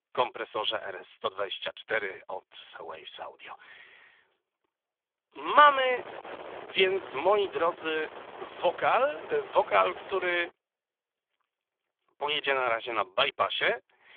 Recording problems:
phone-call audio; poor line; nothing above 3.5 kHz
thin; very; fading below 500 Hz
wind noise on the microphone; occasional gusts; from 5.5 to 10 s; 15 dB below the speech

